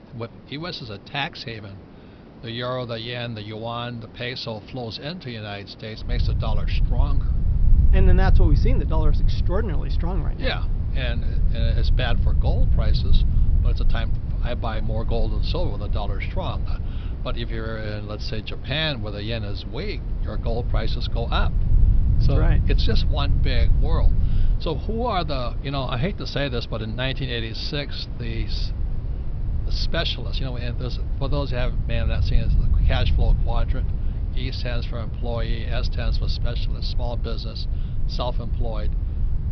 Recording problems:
high frequencies cut off; noticeable; nothing above 5.5 kHz
hiss; noticeable; throughout; 15 dB below the speech
low rumble; noticeable; from 6 s on; 10 dB below the speech

